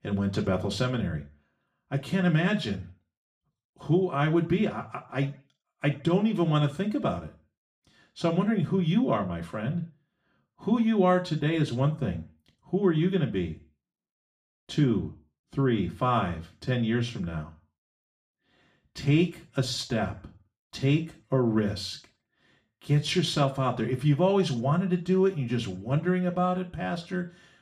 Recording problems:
off-mic speech; far
room echo; very slight; dies away in 0.4 s

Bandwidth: 14.5 kHz